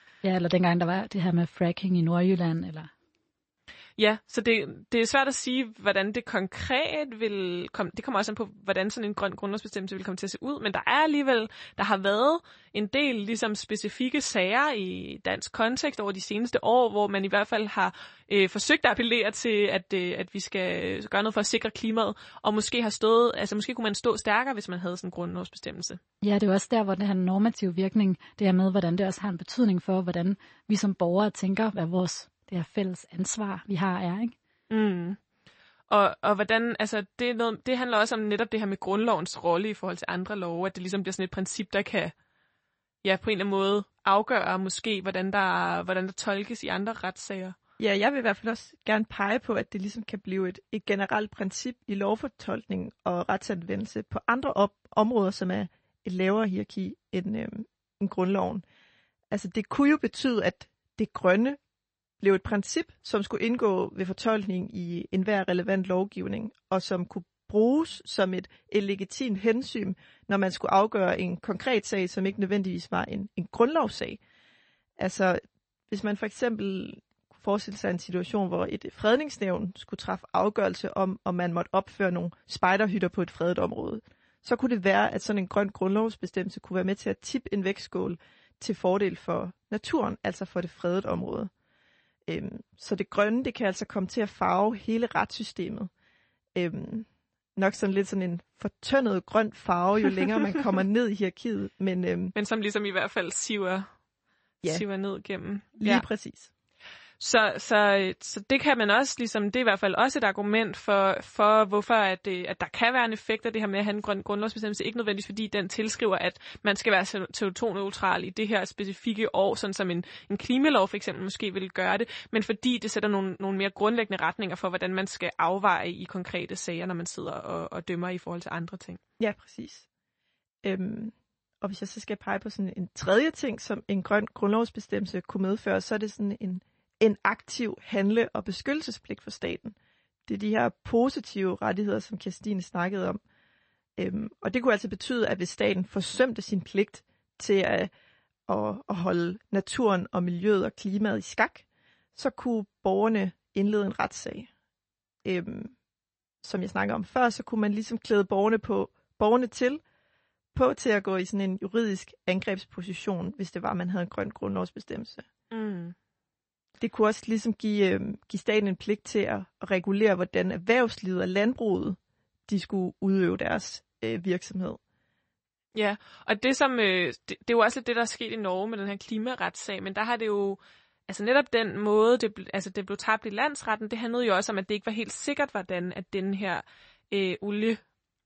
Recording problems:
garbled, watery; slightly; nothing above 8 kHz

